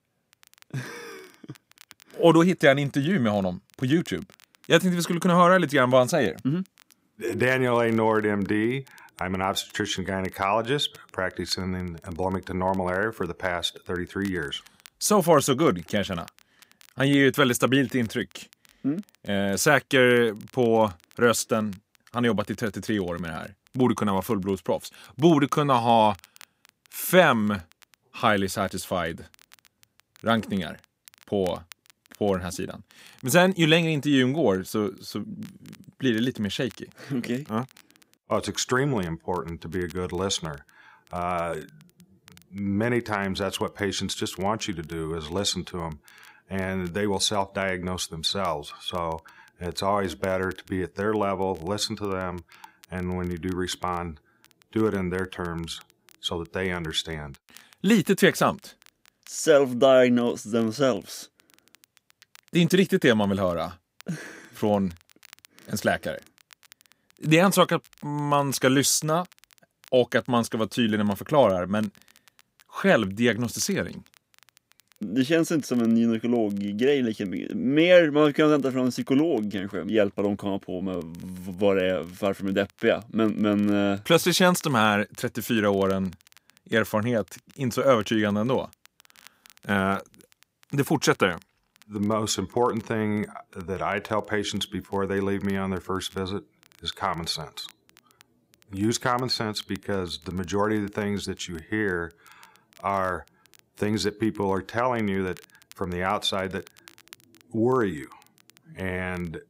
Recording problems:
crackle, like an old record; faint; 30 dB below the speech

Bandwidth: 15.5 kHz